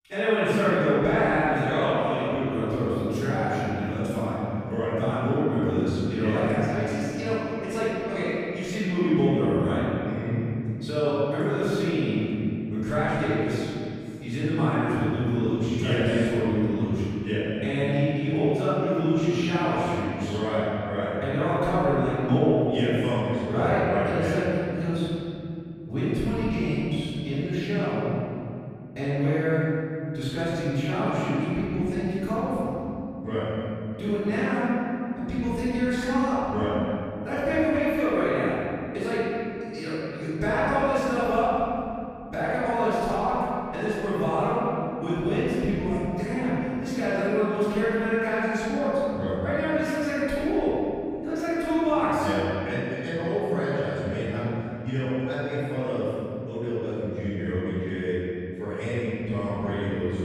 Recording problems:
room echo; strong; dies away in 2.9 s
off-mic speech; far

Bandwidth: 14.5 kHz